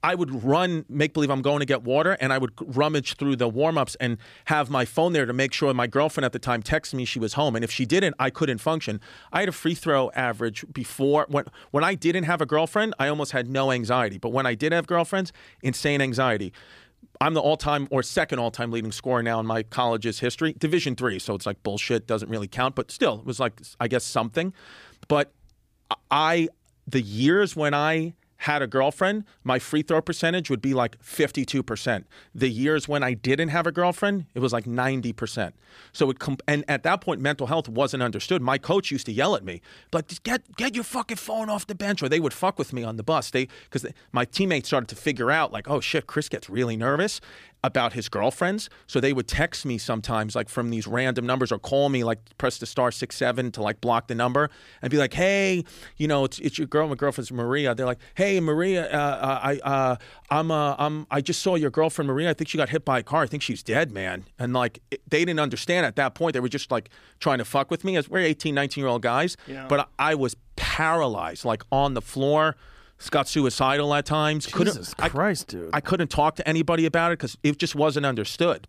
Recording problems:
none

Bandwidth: 15 kHz